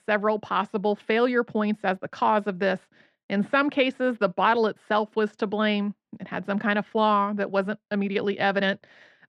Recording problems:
muffled; slightly; fading above 3 kHz

